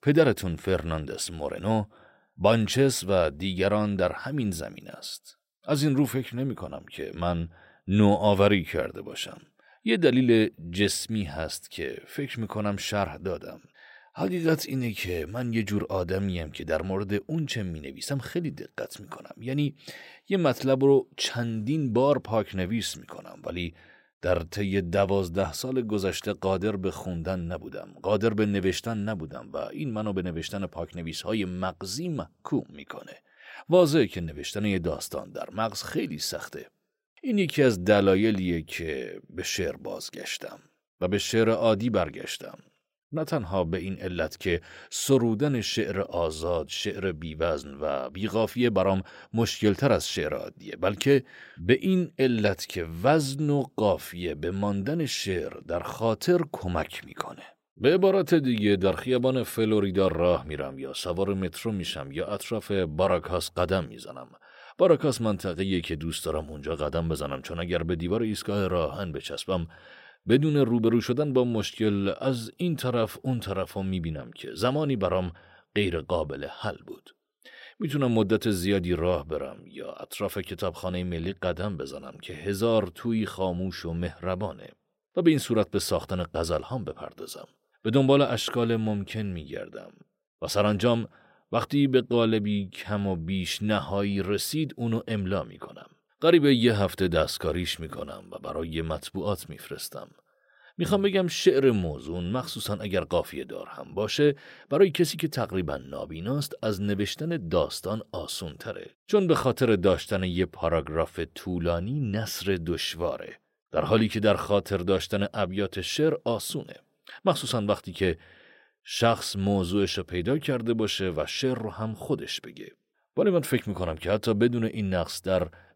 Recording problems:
none

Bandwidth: 16 kHz